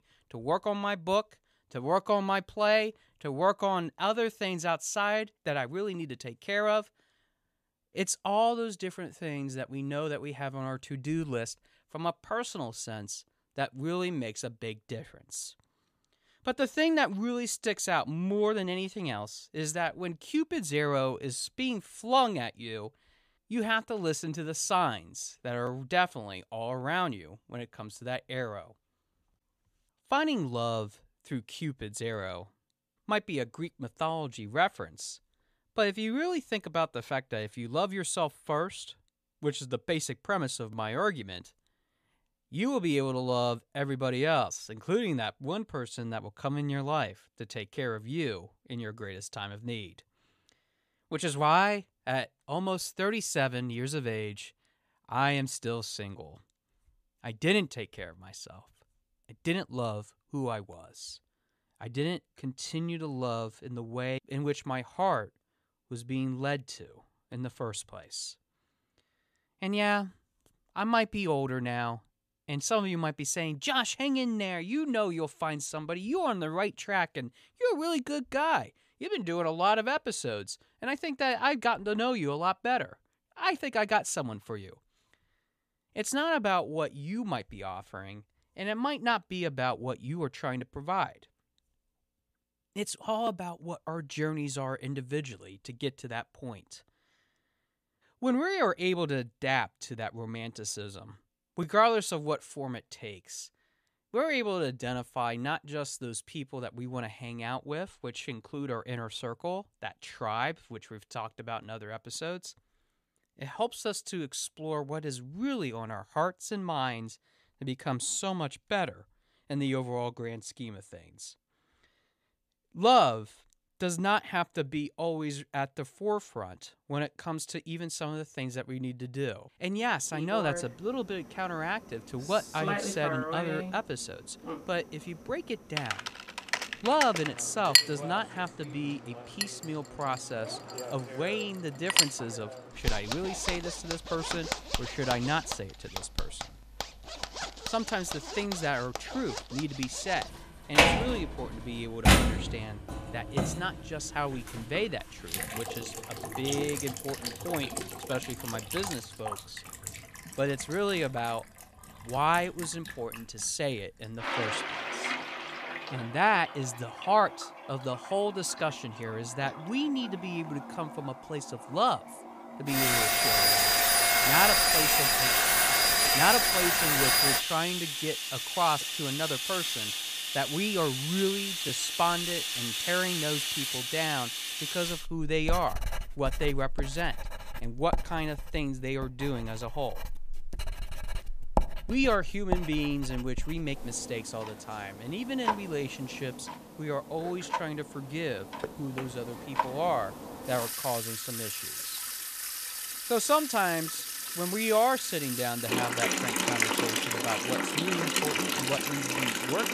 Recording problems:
household noises; very loud; from 2:10 on; 3 dB above the speech

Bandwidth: 14.5 kHz